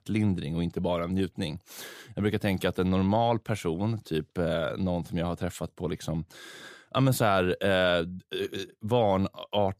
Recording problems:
none

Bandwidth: 15 kHz